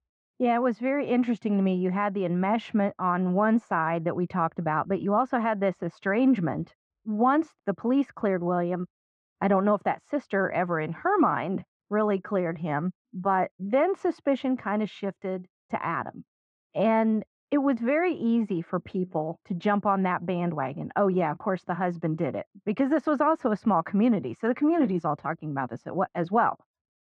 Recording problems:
muffled; very; fading above 1.5 kHz

